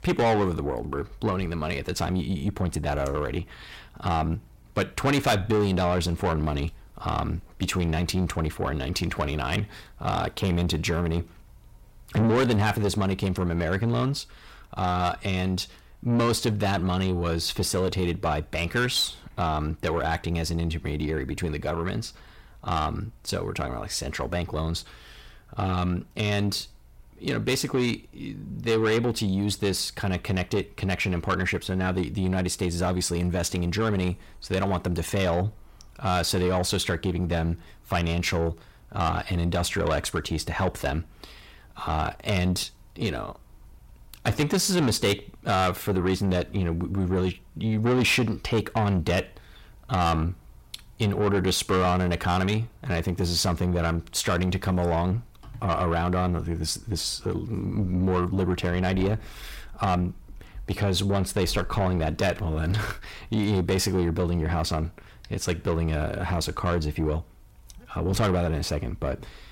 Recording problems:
distortion; heavy; 8 dB below the speech

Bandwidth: 16 kHz